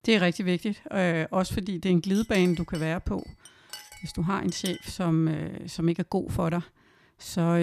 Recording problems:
clattering dishes; faint; from 2 to 5 s; peak 10 dB below the speech
abrupt cut into speech; at the end

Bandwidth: 14.5 kHz